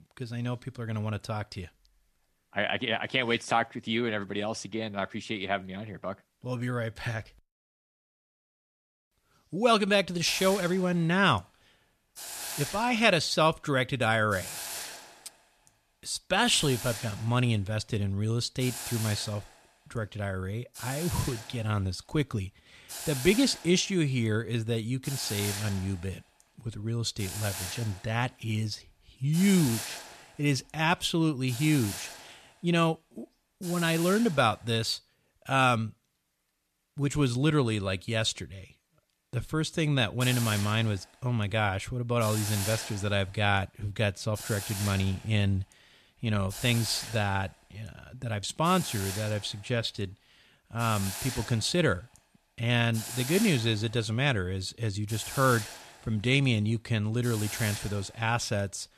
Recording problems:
hiss; loud; from 10 to 35 s and from 40 s on; 9 dB below the speech

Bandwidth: 14 kHz